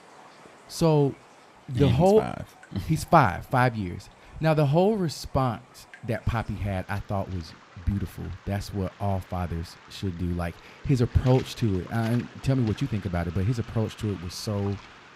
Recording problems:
rain or running water; faint; throughout; 20 dB below the speech

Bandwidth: 15.5 kHz